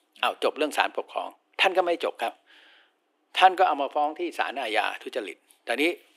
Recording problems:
thin; very; fading below 350 Hz

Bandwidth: 15.5 kHz